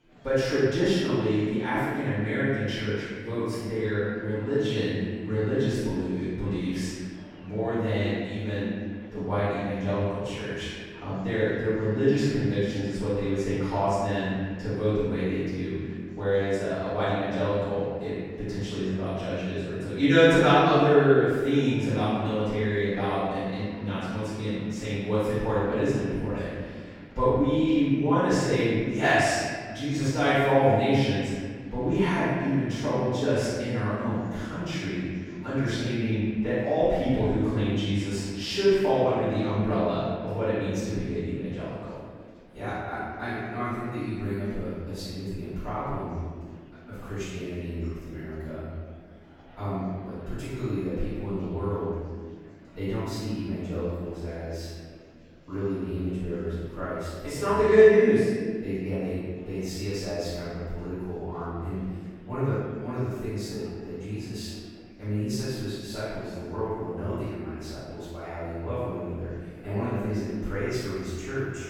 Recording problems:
room echo; strong; dies away in 1.7 s
off-mic speech; far
murmuring crowd; faint; throughout; 25 dB below the speech

